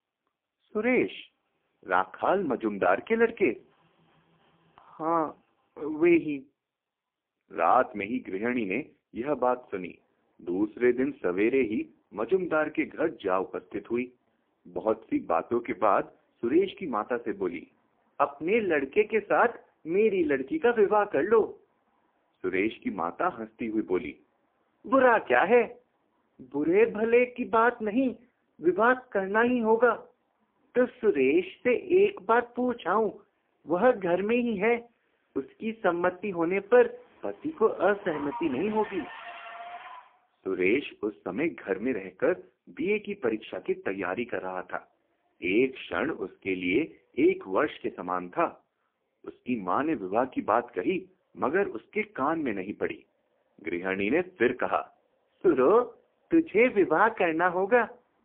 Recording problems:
phone-call audio; poor line
traffic noise; noticeable; throughout; 20 dB below the speech

